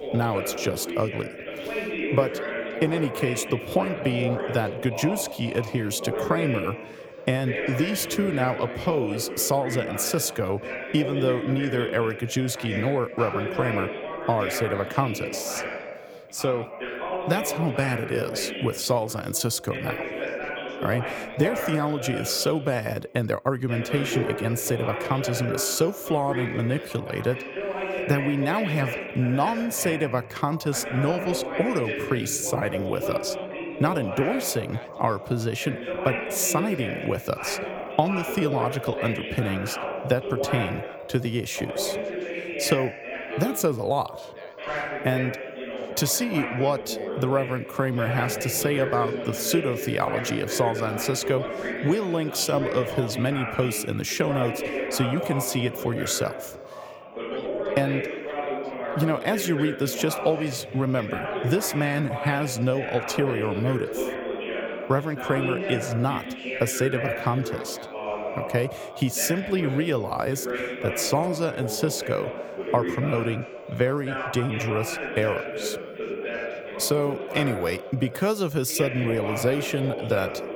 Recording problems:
background chatter; loud; throughout; 3 voices, 5 dB below the speech

